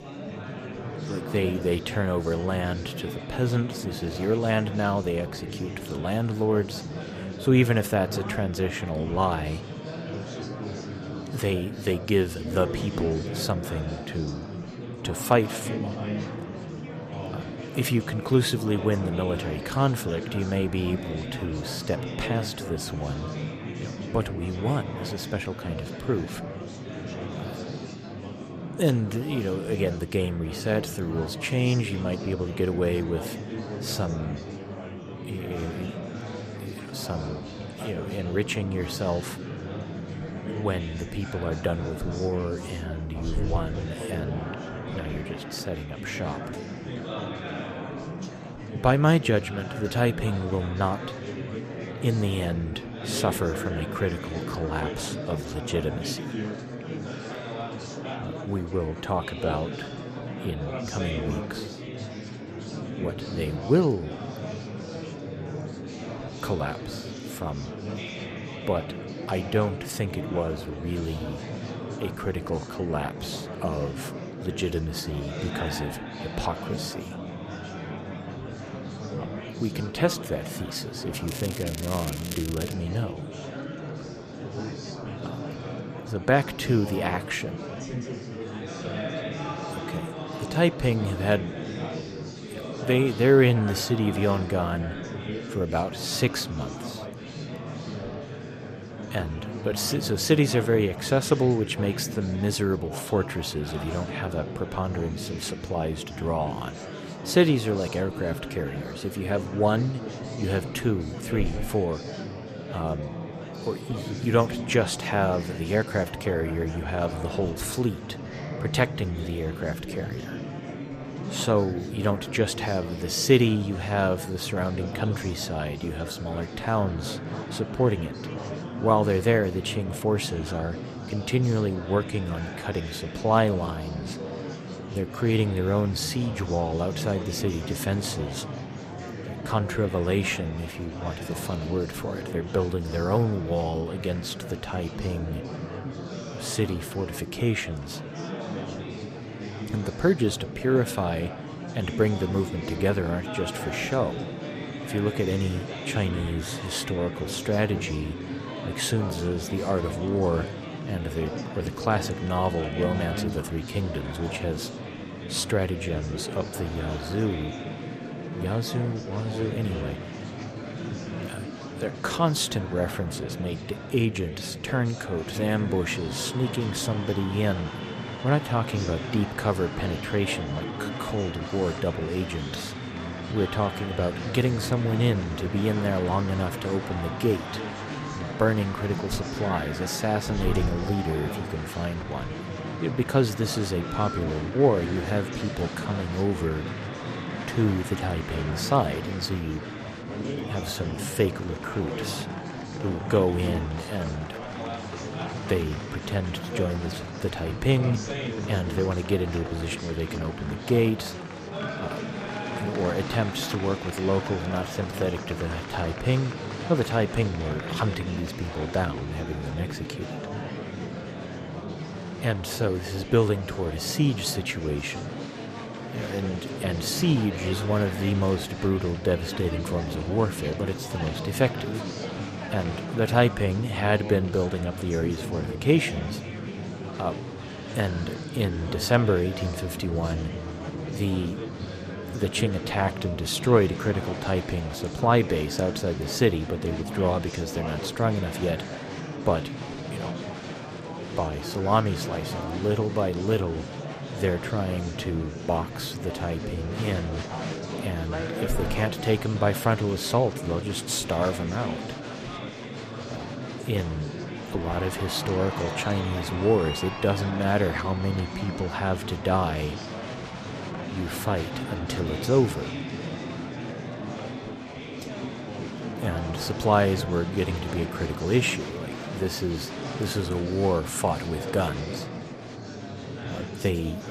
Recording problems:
murmuring crowd; loud; throughout; 7 dB below the speech
crackling; loud; from 1:21 to 1:23; 10 dB below the speech
phone ringing; noticeable; at 3:14; peak 8 dB below the speech

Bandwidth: 14.5 kHz